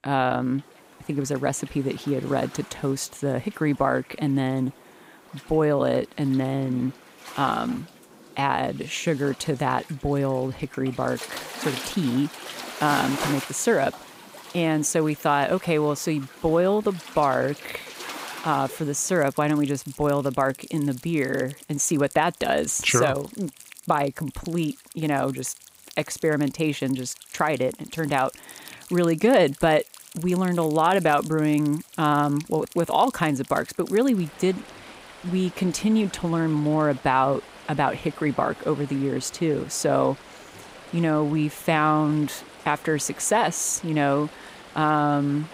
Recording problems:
rain or running water; noticeable; throughout; 15 dB below the speech

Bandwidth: 15.5 kHz